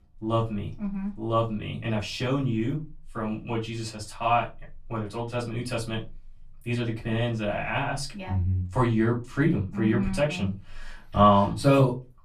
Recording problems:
off-mic speech; far
room echo; very slight; dies away in 0.2 s

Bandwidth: 14 kHz